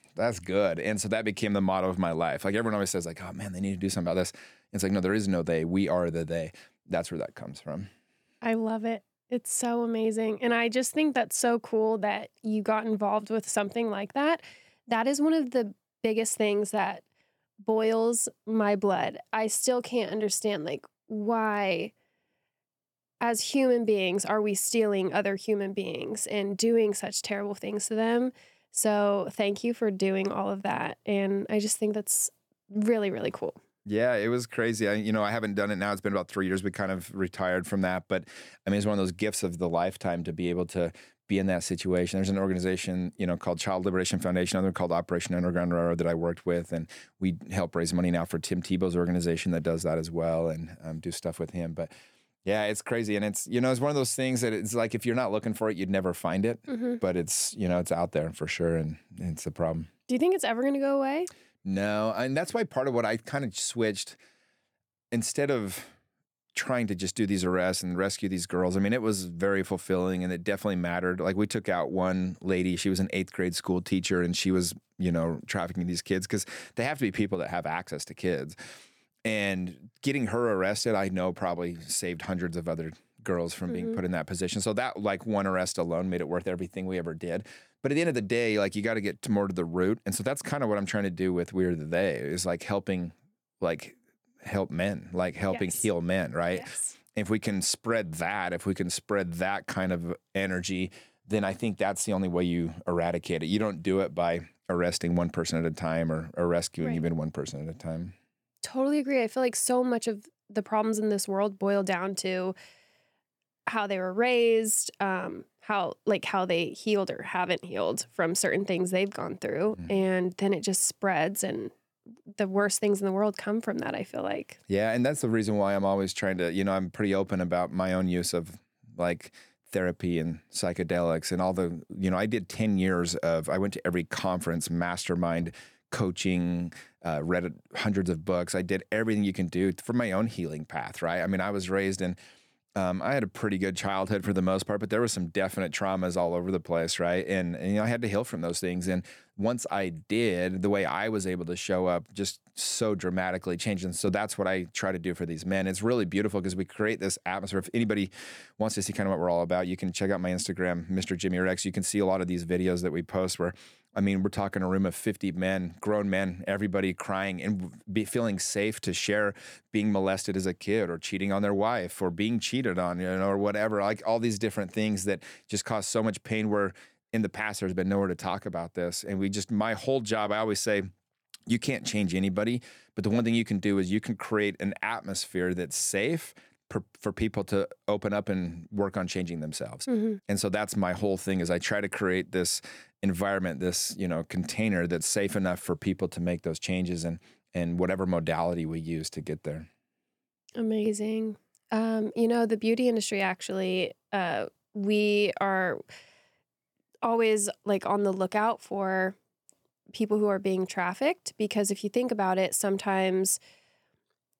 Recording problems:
none

